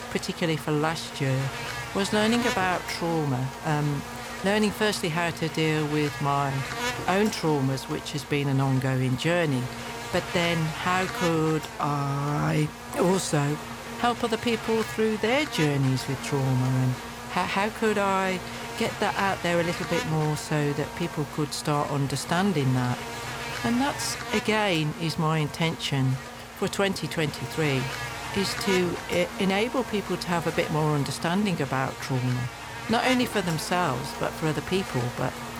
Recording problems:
electrical hum; loud; throughout; 50 Hz, 6 dB below the speech

